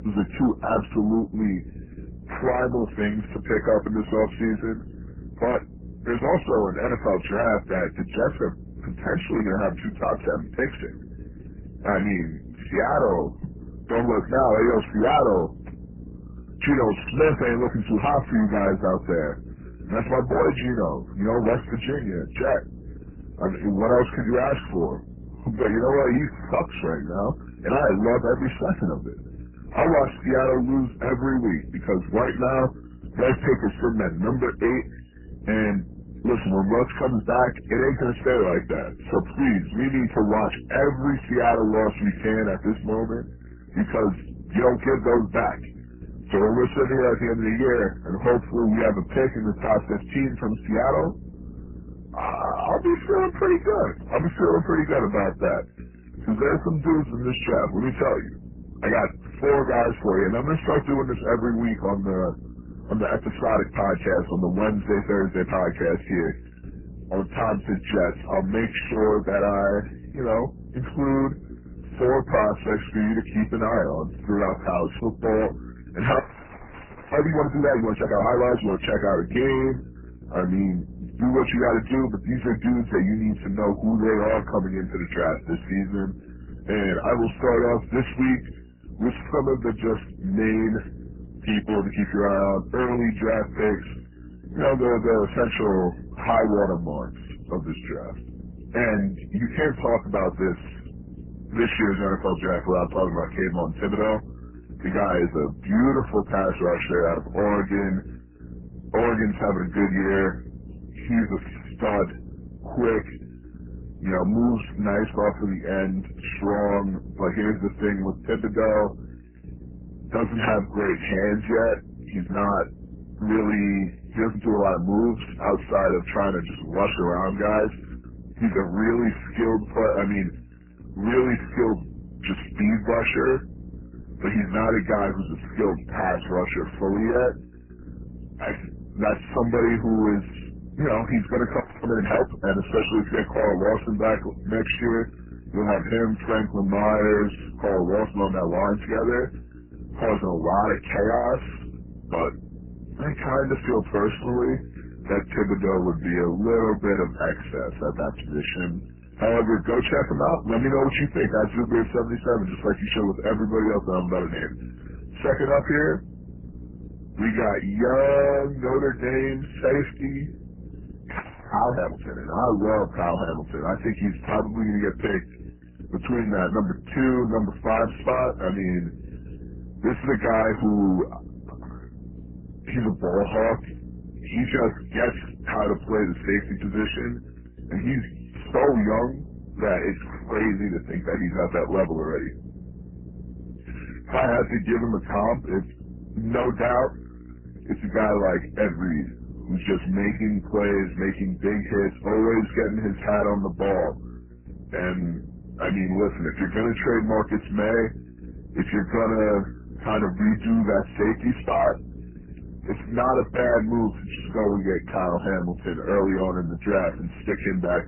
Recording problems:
garbled, watery; badly; nothing above 3 kHz
distortion; slight; 10 dB below the speech
electrical hum; faint; throughout; 60 Hz, 25 dB below the speech
audio freezing; at 1:16 for 1 s, at 2:22 and at 2:51

